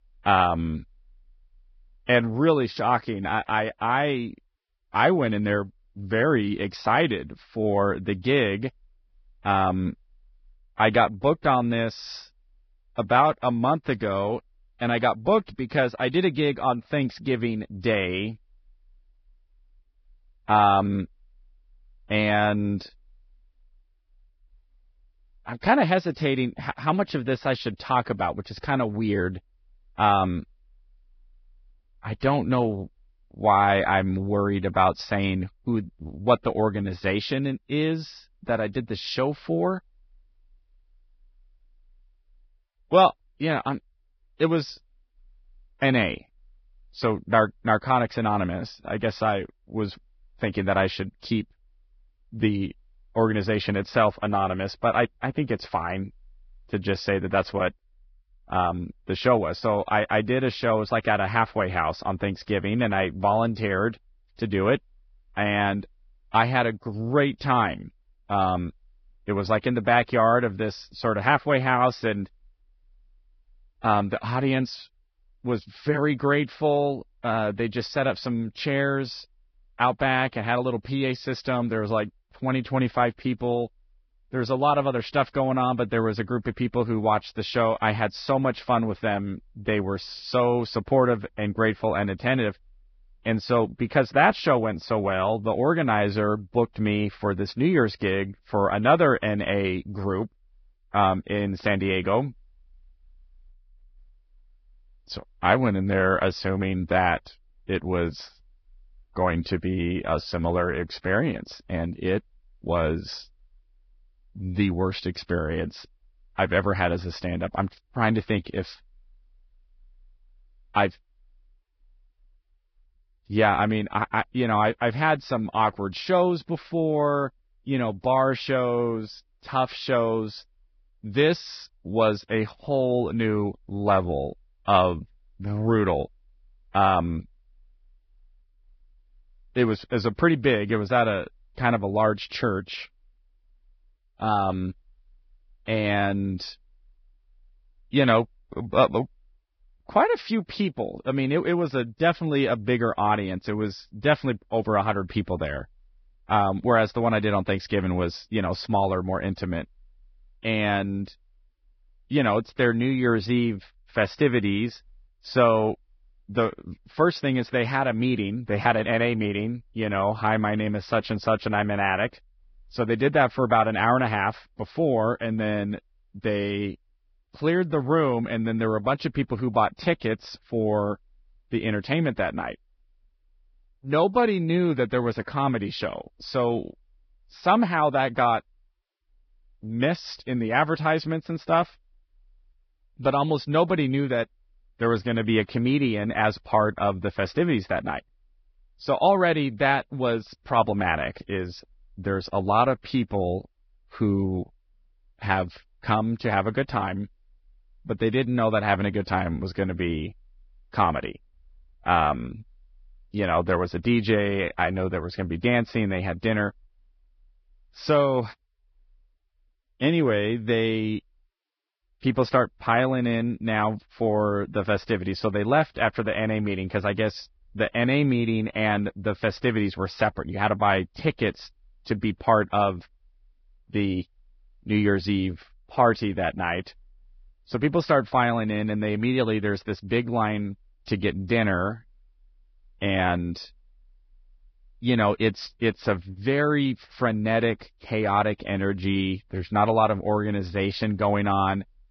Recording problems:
garbled, watery; badly; nothing above 5.5 kHz

